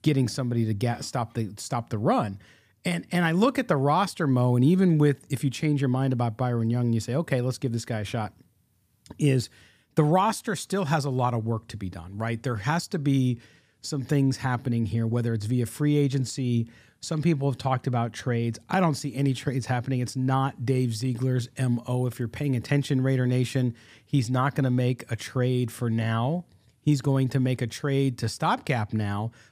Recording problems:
none

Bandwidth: 15 kHz